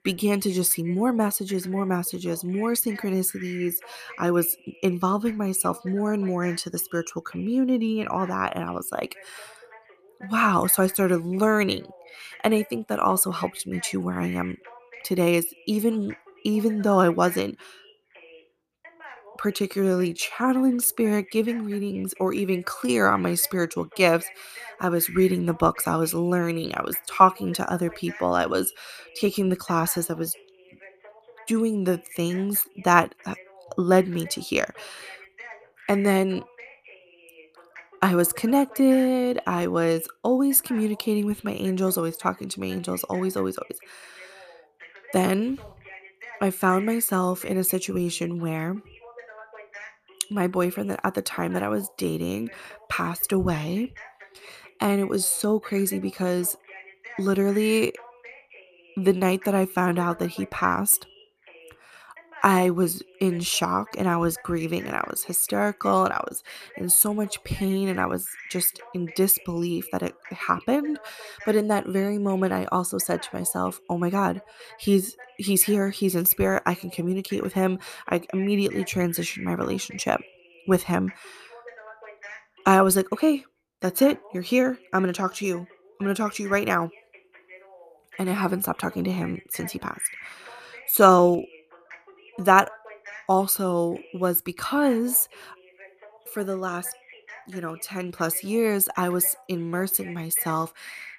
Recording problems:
voice in the background; faint; throughout; 20 dB below the speech

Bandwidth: 14.5 kHz